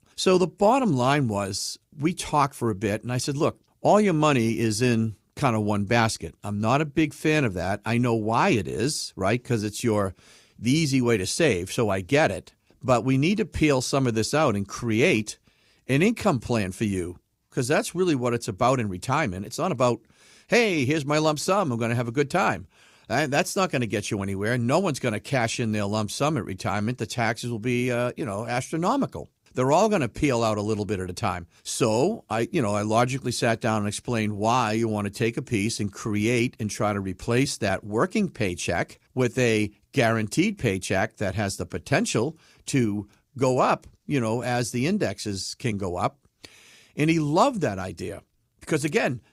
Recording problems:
none

